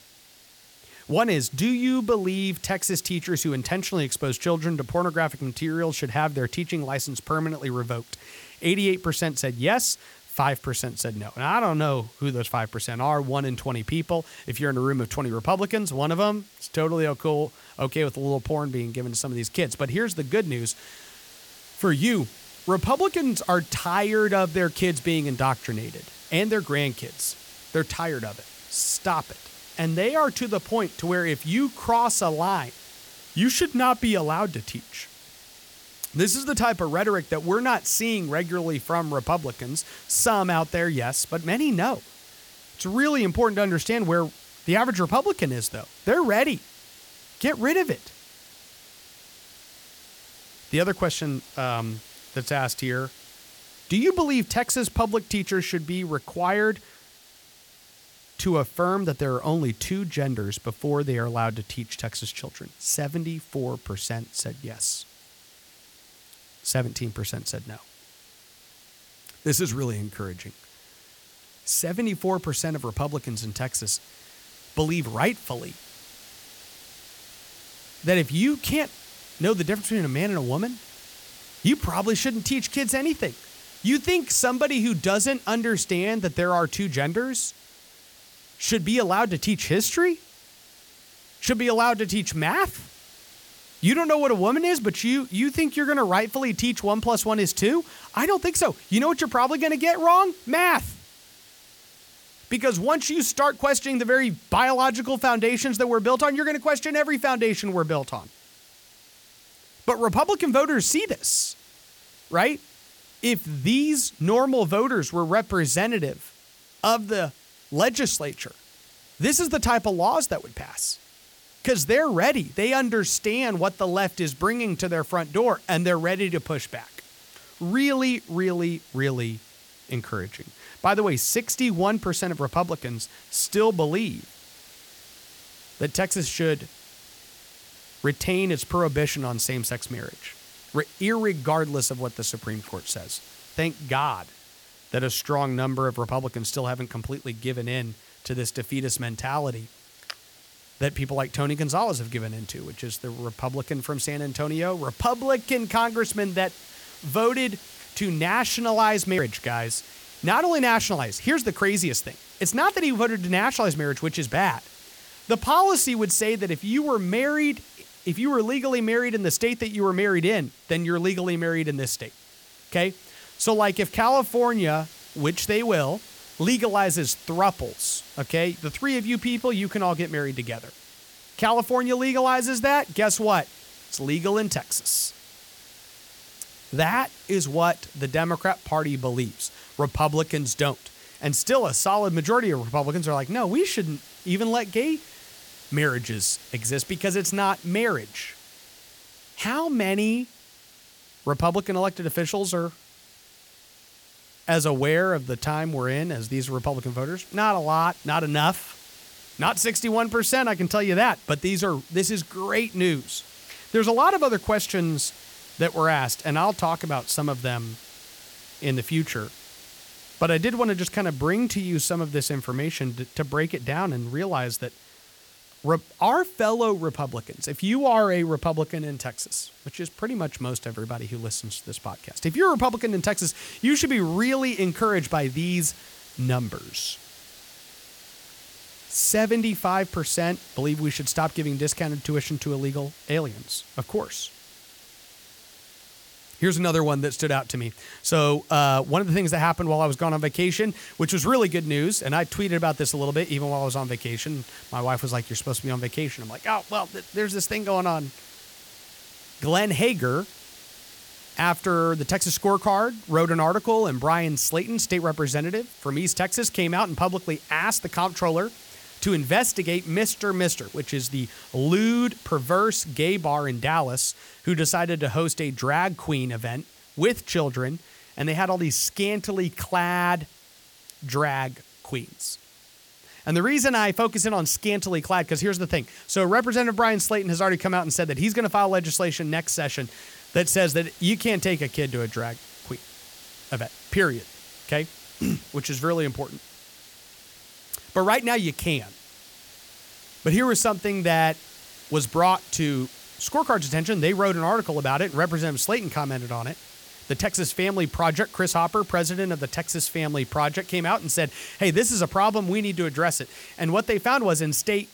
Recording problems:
hiss; faint; throughout; 20 dB below the speech

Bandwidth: 18 kHz